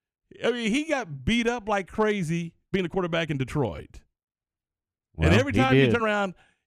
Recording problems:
uneven, jittery; strongly; from 0.5 to 6 s

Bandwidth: 14.5 kHz